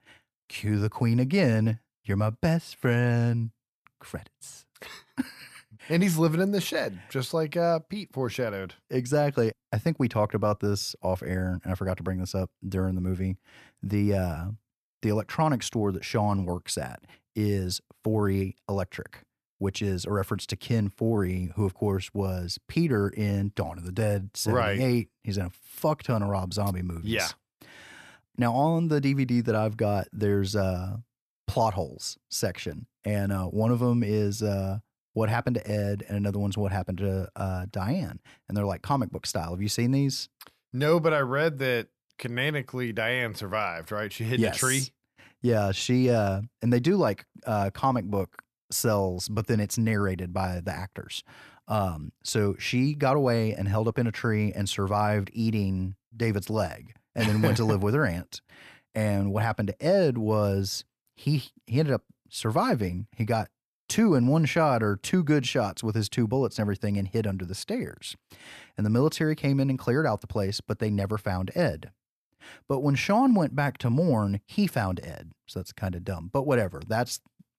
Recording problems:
none

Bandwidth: 14 kHz